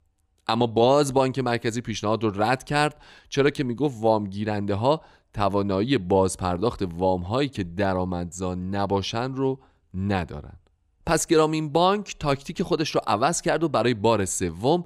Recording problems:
none

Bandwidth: 15.5 kHz